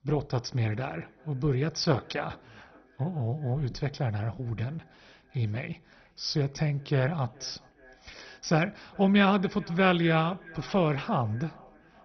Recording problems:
garbled, watery; badly; nothing above 6 kHz
echo of what is said; faint; throughout; 420 ms later, 25 dB below the speech

